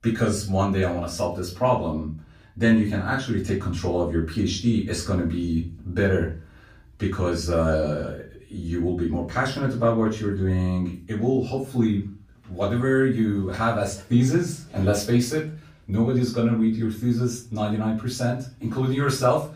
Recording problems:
off-mic speech; far
room echo; slight; dies away in 0.3 s

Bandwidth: 15 kHz